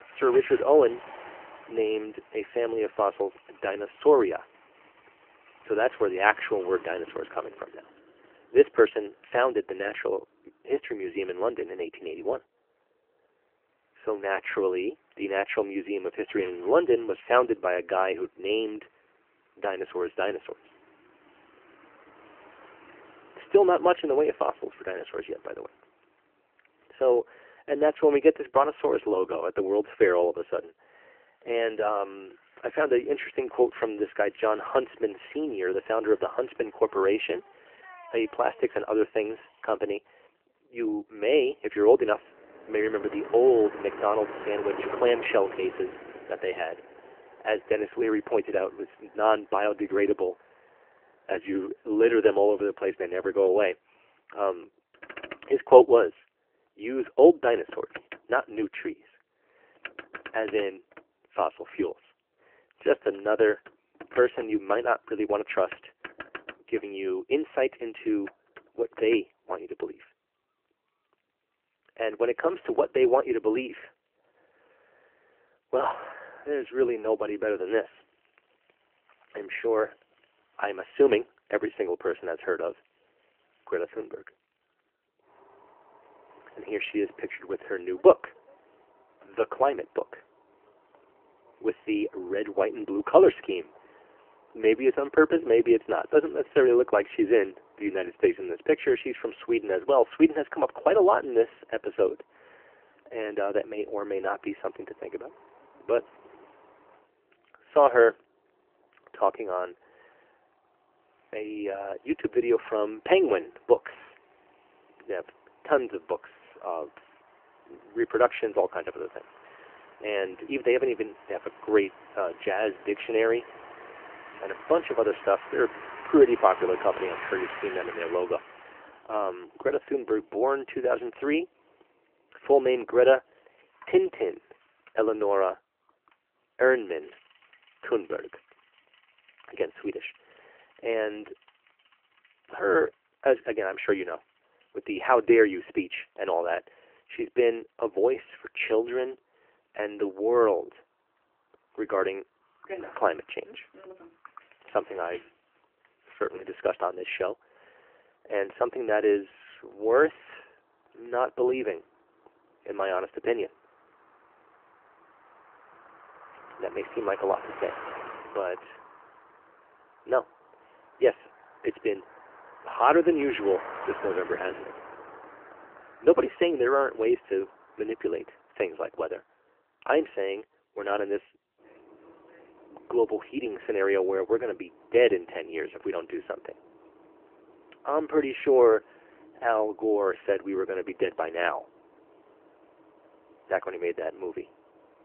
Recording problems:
phone-call audio; nothing above 3 kHz
traffic noise; noticeable; throughout; 20 dB below the speech

